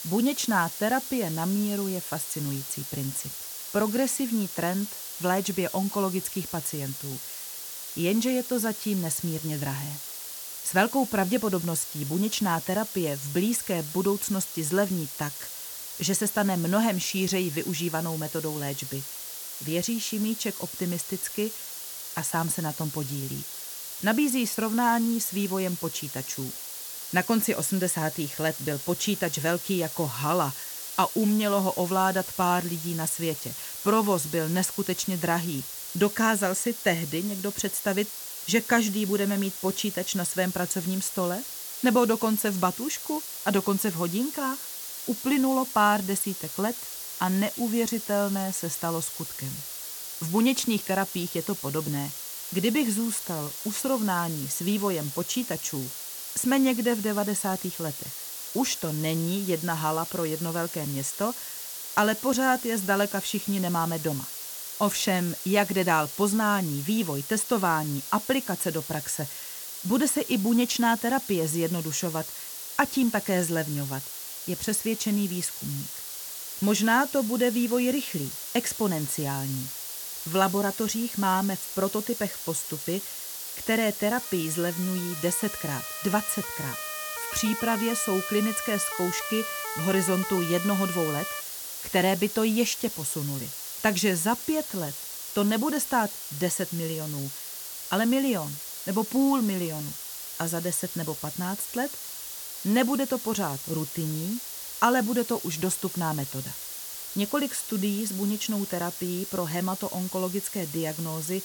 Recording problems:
hiss; loud; throughout; 7 dB below the speech
siren; noticeable; from 1:24 to 1:31; peak 6 dB below the speech

